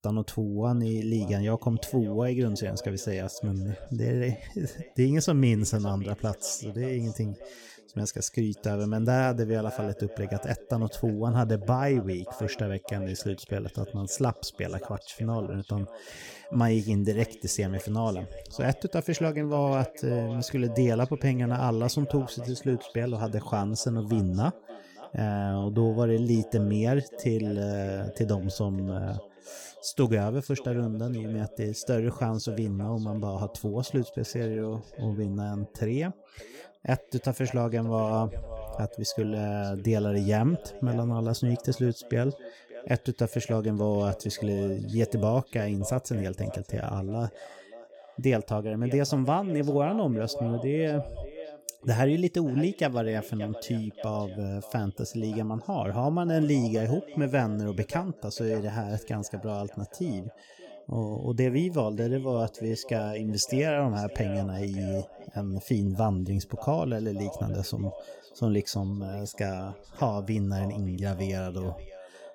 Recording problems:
echo of what is said; noticeable; throughout; 580 ms later, 15 dB below the speech

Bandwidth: 17.5 kHz